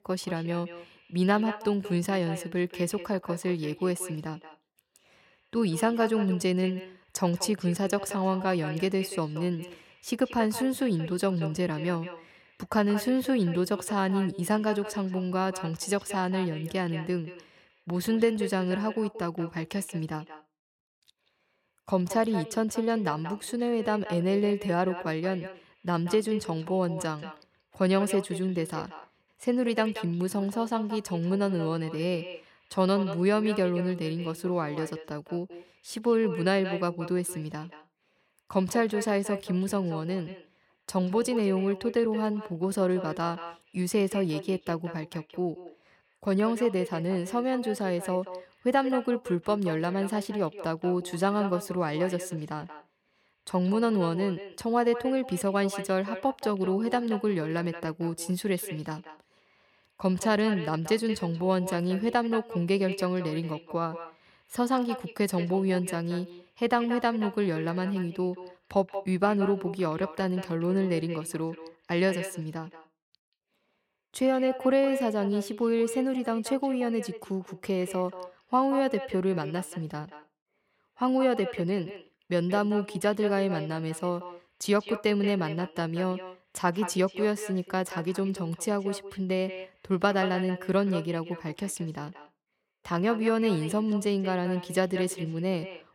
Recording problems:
echo of what is said; noticeable; throughout; 180 ms later, 15 dB below the speech

